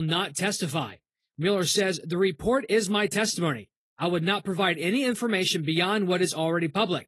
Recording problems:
garbled, watery; slightly; nothing above 12 kHz
abrupt cut into speech; at the start

